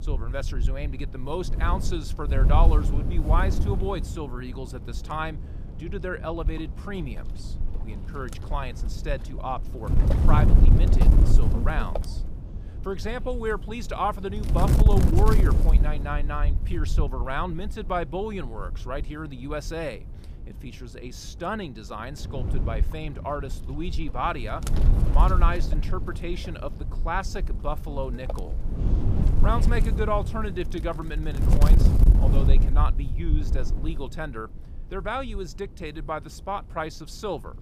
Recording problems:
wind noise on the microphone; heavy; 8 dB below the speech

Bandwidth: 15 kHz